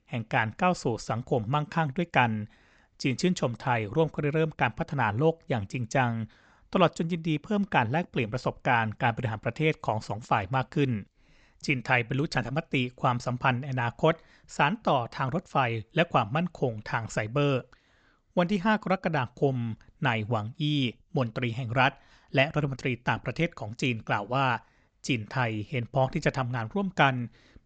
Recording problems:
high frequencies cut off; noticeable; nothing above 8 kHz

